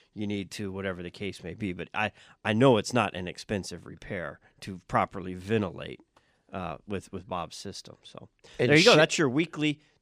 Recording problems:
none

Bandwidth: 15 kHz